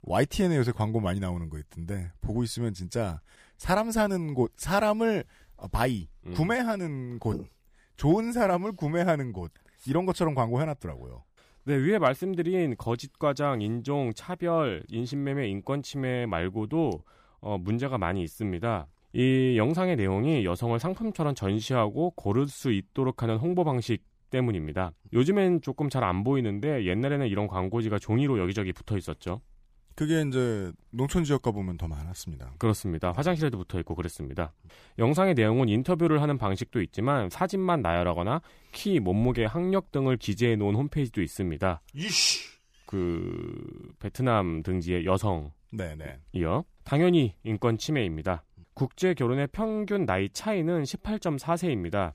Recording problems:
none

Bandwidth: 15 kHz